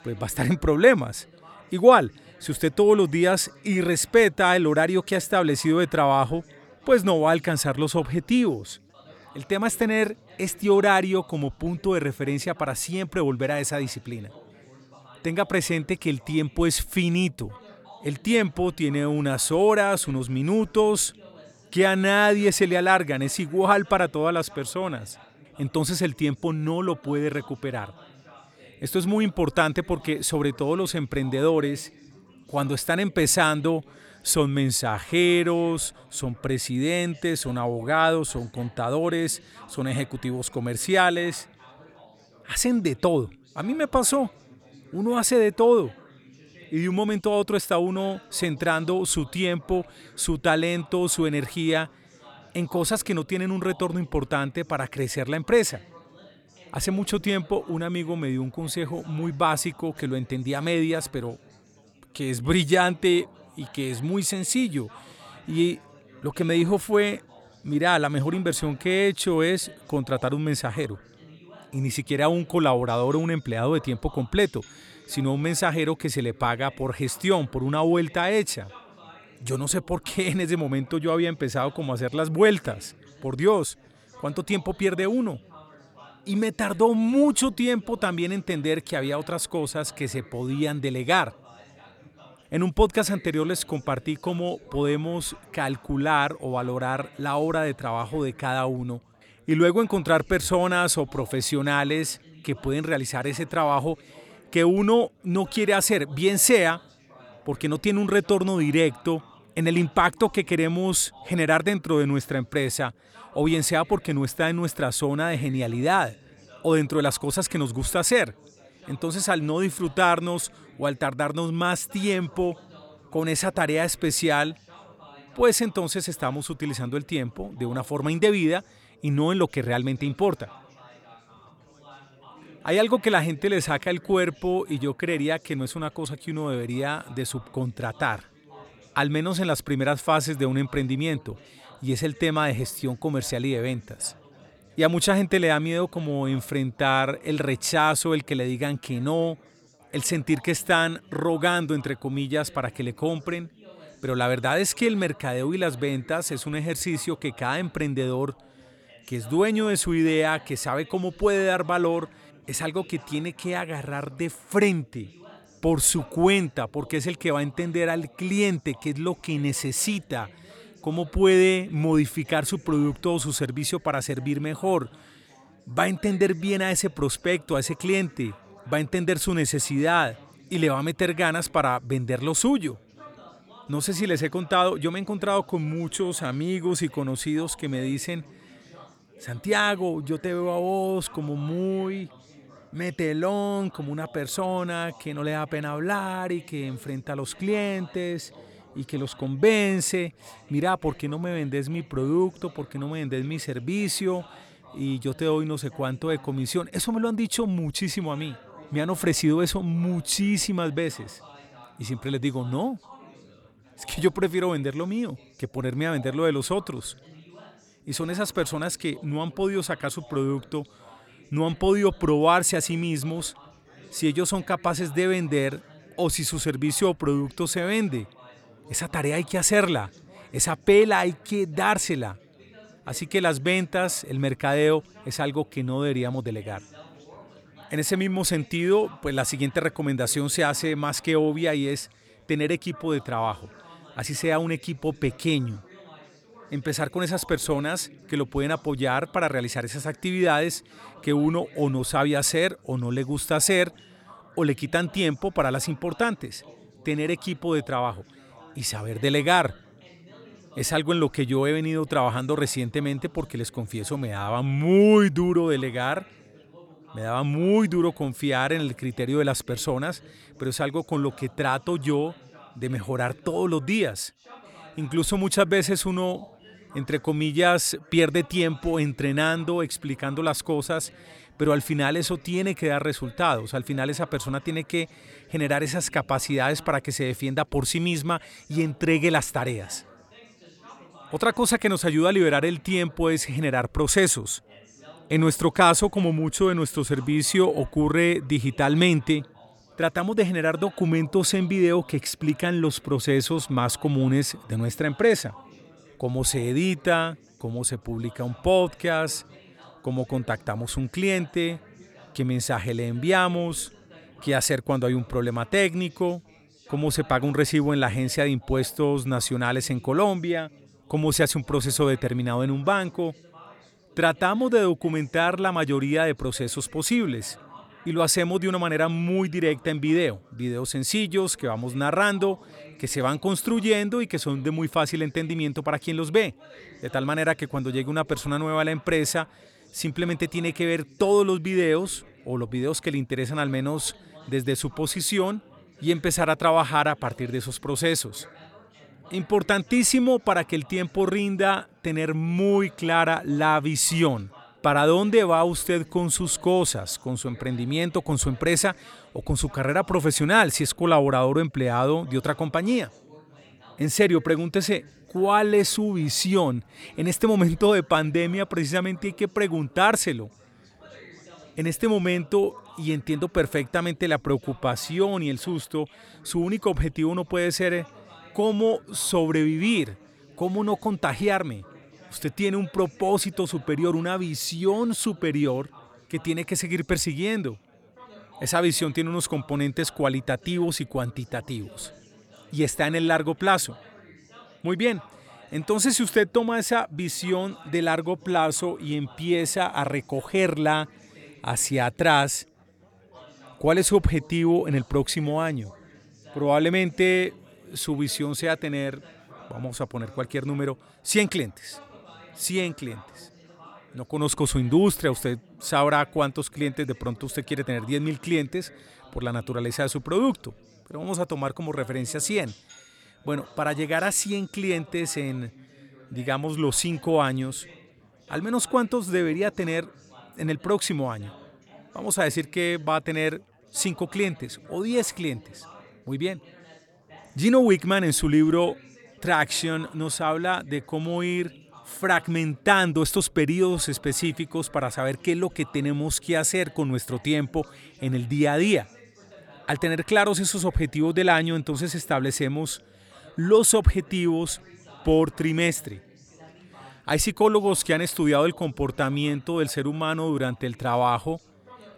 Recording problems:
chatter from many people; faint; throughout; 25 dB below the speech

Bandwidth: 18.5 kHz